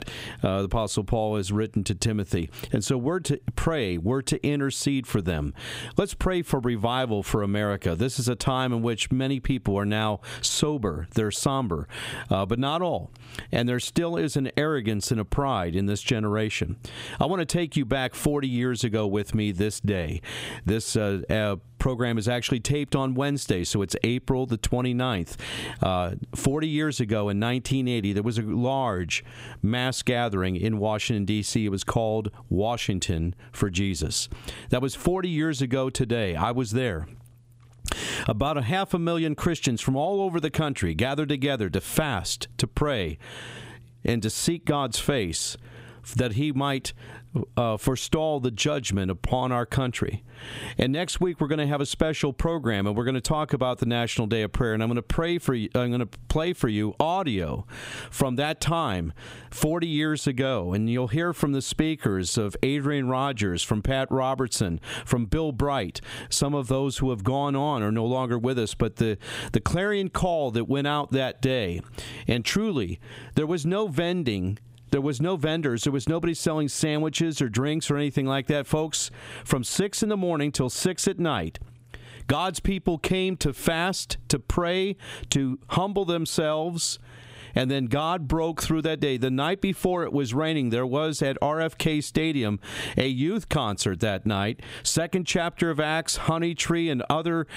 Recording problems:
squashed, flat; somewhat

